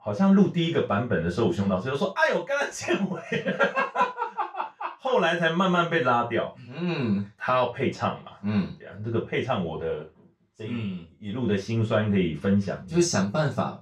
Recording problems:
off-mic speech; far
room echo; slight; dies away in 0.2 s

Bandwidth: 15.5 kHz